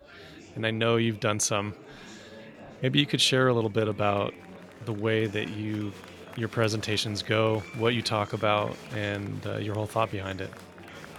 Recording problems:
murmuring crowd; noticeable; throughout; 20 dB below the speech

